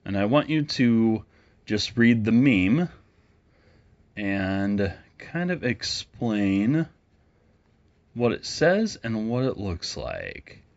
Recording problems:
high frequencies cut off; noticeable; nothing above 8 kHz

